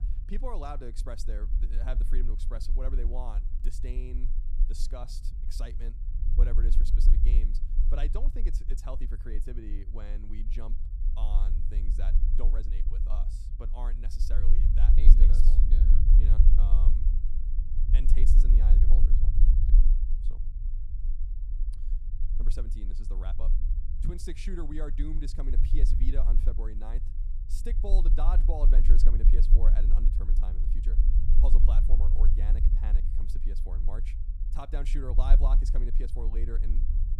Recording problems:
low rumble; loud; throughout; 6 dB below the speech

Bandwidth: 14.5 kHz